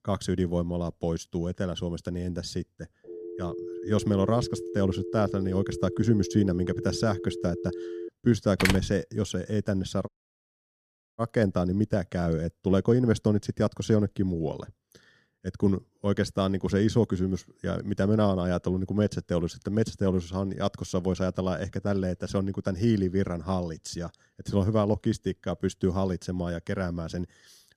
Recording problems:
phone ringing; noticeable; from 3 to 8 s; peak 8 dB below the speech
door banging; loud; at 8.5 s; peak 1 dB above the speech
audio cutting out; at 10 s for 1 s

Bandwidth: 14.5 kHz